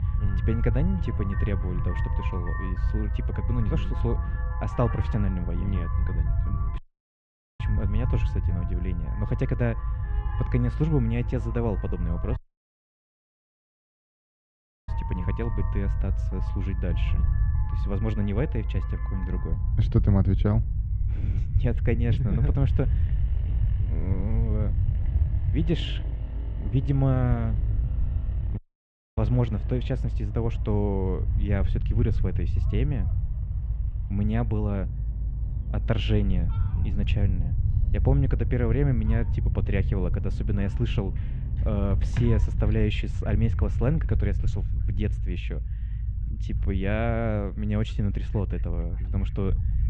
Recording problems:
muffled; very; fading above 3 kHz
traffic noise; noticeable; throughout; 15 dB below the speech
low rumble; noticeable; throughout; 10 dB below the speech
animal sounds; faint; from 28 s on; 30 dB below the speech
audio cutting out; at 7 s for 1 s, at 12 s for 2.5 s and at 29 s for 0.5 s

